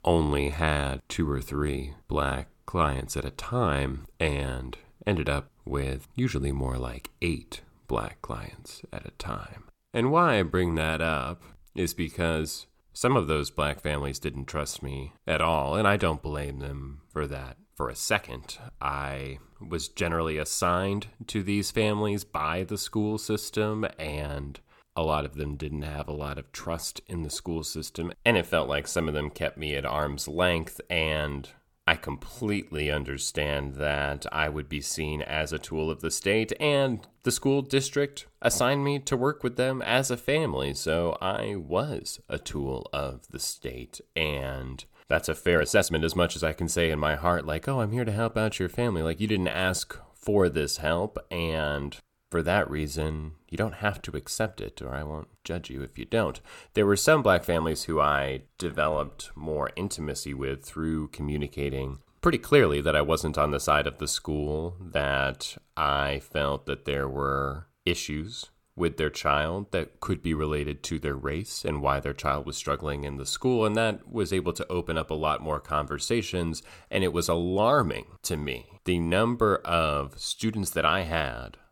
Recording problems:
uneven, jittery; strongly; from 15 s to 1:00

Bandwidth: 17 kHz